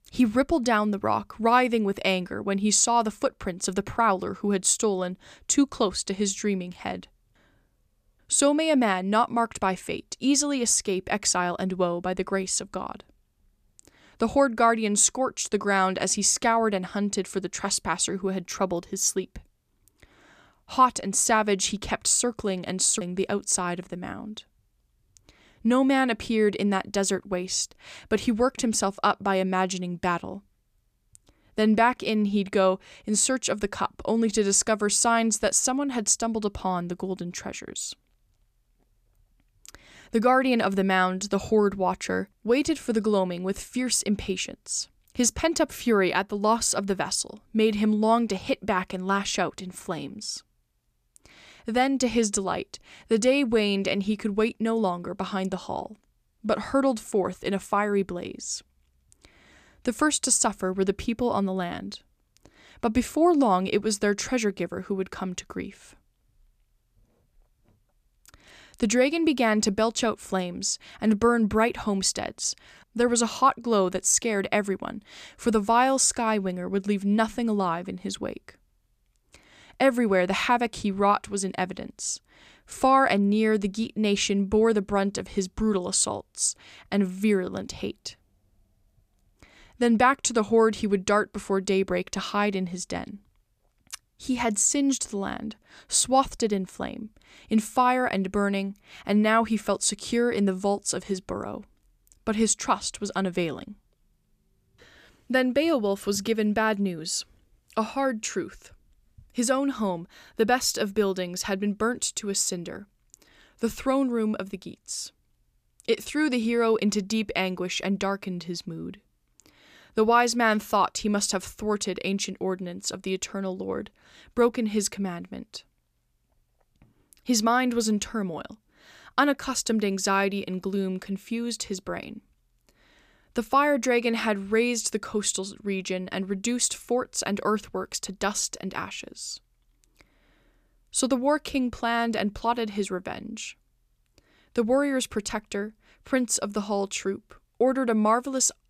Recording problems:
none

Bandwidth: 14.5 kHz